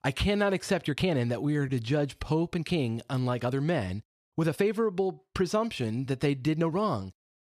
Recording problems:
uneven, jittery; strongly; from 1 to 6.5 s

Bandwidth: 14 kHz